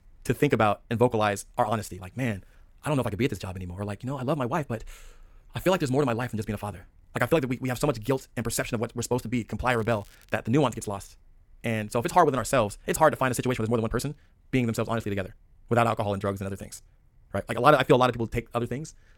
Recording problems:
wrong speed, natural pitch; too fast; 1.8 times normal speed
crackling; faint; at 9.5 s; 30 dB below the speech

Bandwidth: 17 kHz